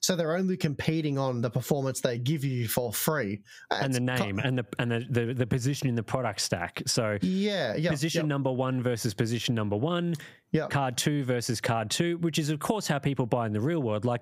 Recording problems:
squashed, flat; somewhat

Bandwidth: 15.5 kHz